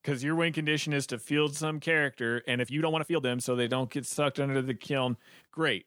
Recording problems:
uneven, jittery; strongly; from 1 to 5 s

